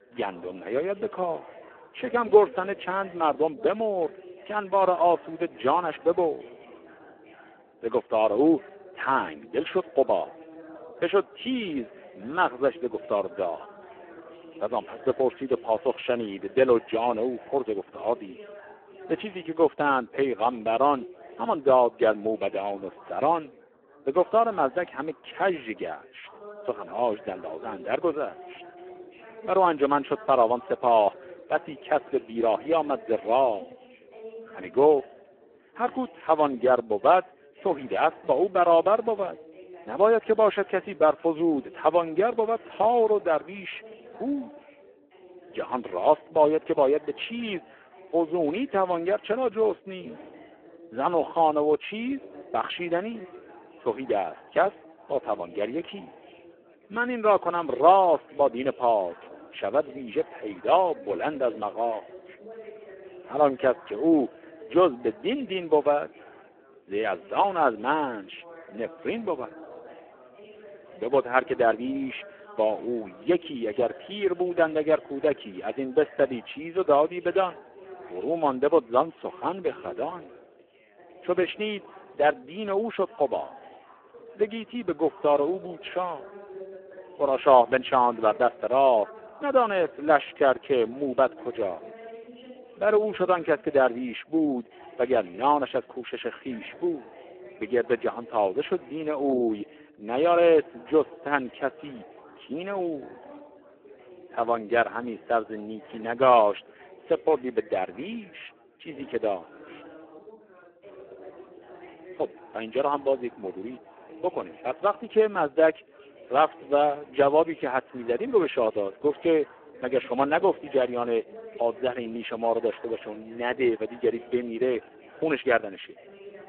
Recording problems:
phone-call audio; poor line
background chatter; faint; throughout; 4 voices, 20 dB below the speech

